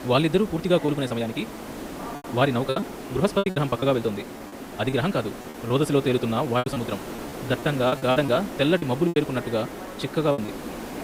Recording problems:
wrong speed, natural pitch; too fast; 1.5 times normal speed
background chatter; noticeable; throughout; 2 voices, 20 dB below the speech
hiss; noticeable; throughout; 10 dB below the speech
choppy; very; 10% of the speech affected

